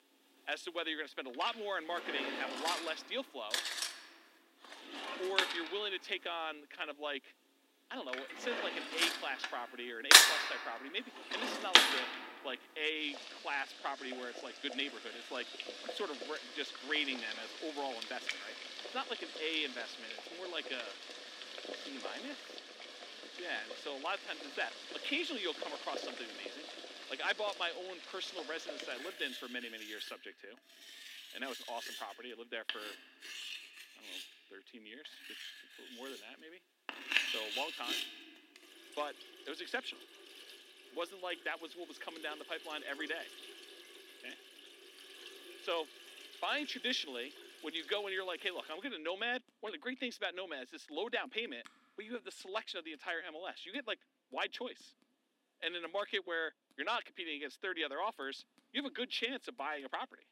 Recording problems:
thin; very slightly; fading below 250 Hz
household noises; very loud; throughout; 4 dB above the speech

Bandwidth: 16 kHz